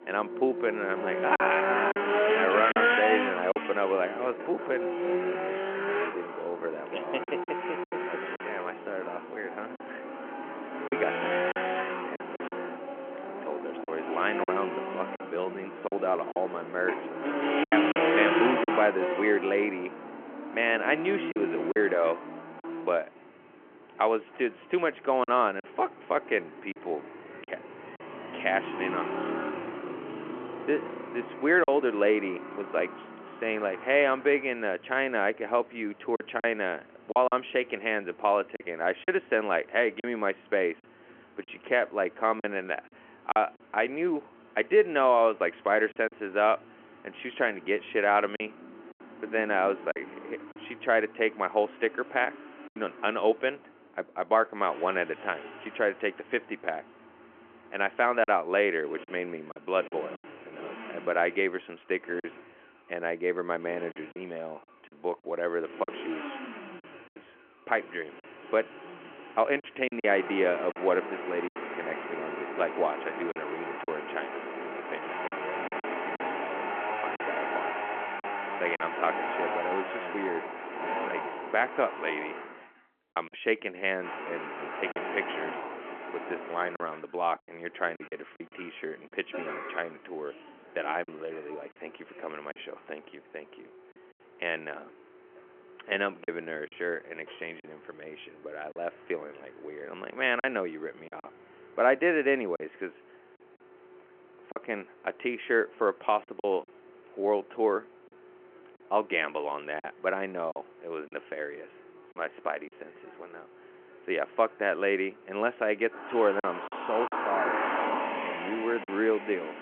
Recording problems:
phone-call audio
traffic noise; loud; throughout; 4 dB below the speech
choppy; occasionally; 4% of the speech affected

